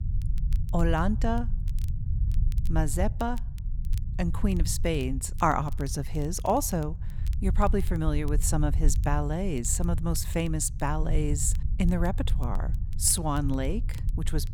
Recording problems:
low rumble; noticeable; throughout; 20 dB below the speech
crackle, like an old record; faint; 25 dB below the speech

